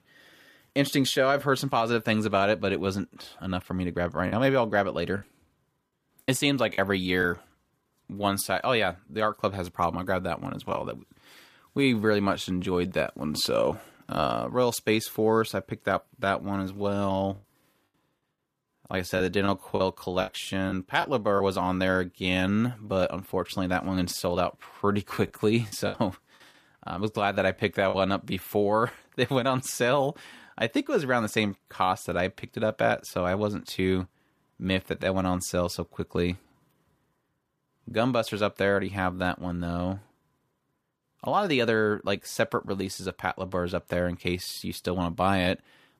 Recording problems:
choppy; very; from 4.5 to 7 s, from 19 to 21 s and from 25 to 28 s; 7% of the speech affected

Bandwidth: 14.5 kHz